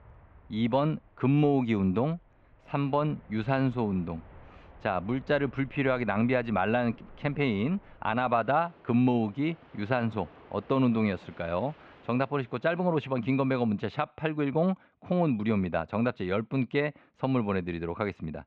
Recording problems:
muffled; slightly; fading above 3 kHz
train or aircraft noise; faint; until 13 s; 25 dB below the speech

